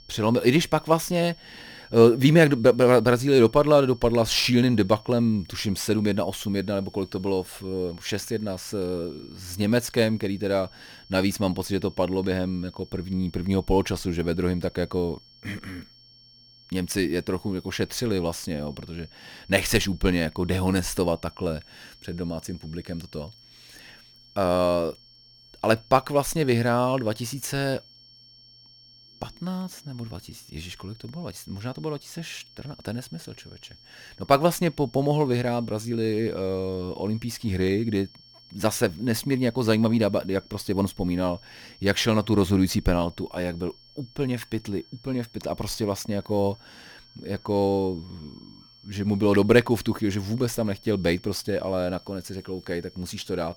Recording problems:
high-pitched whine; faint; throughout; 5.5 kHz, 25 dB below the speech

